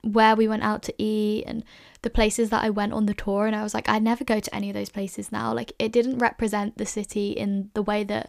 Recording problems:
none

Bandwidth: 15 kHz